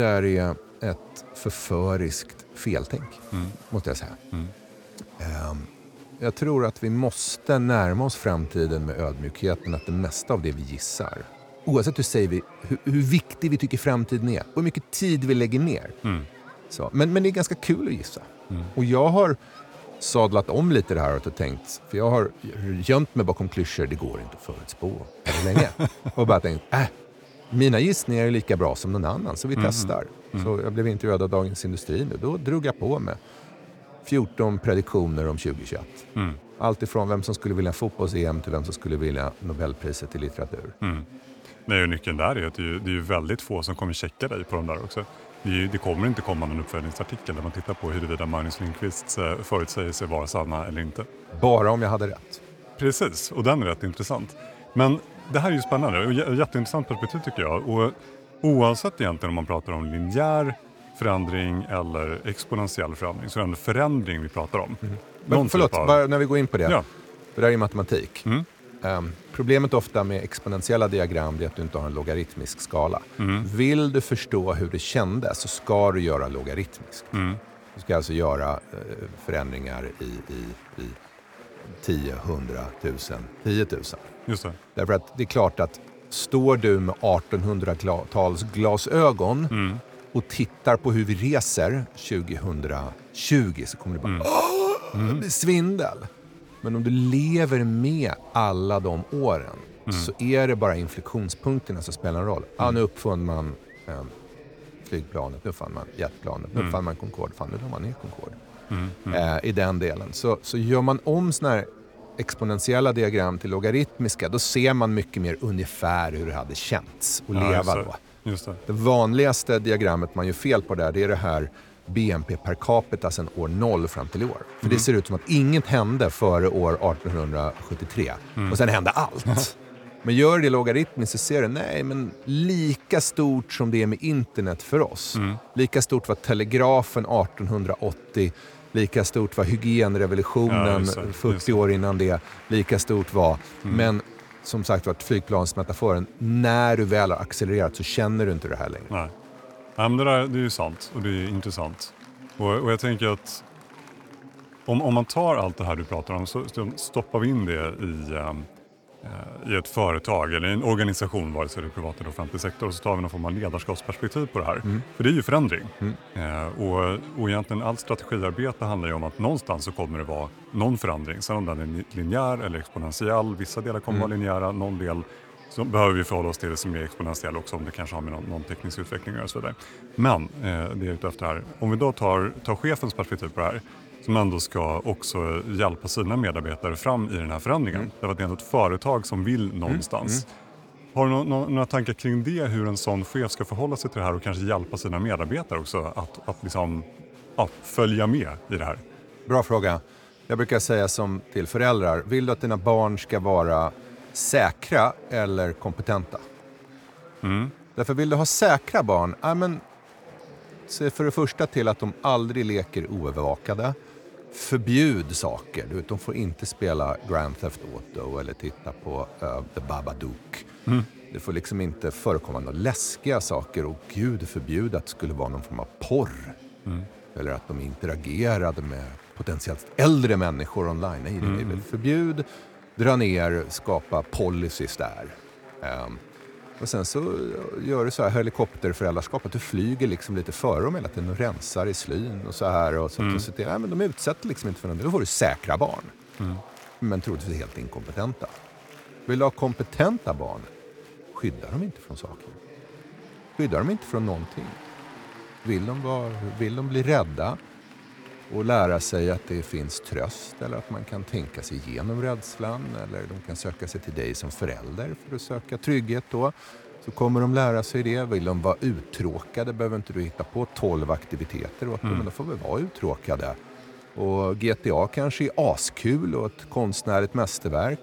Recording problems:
chatter from many people; faint; throughout; 20 dB below the speech
abrupt cut into speech; at the start

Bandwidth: 18.5 kHz